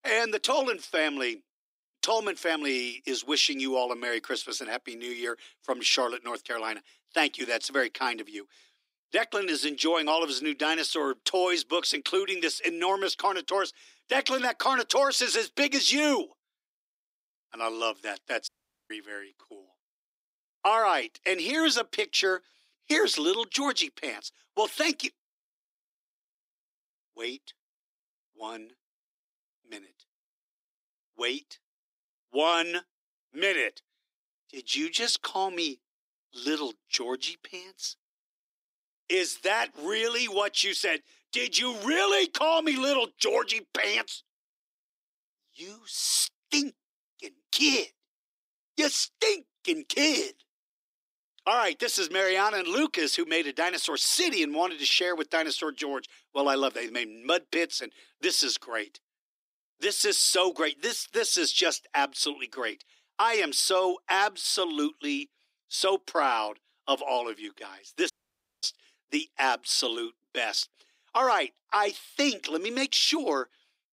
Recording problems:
thin; somewhat; fading below 300 Hz
audio cutting out; at 18 s and at 1:08 for 0.5 s

